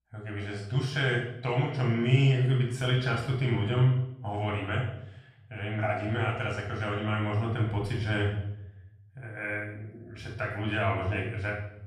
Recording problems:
off-mic speech; far
room echo; noticeable; dies away in 0.7 s

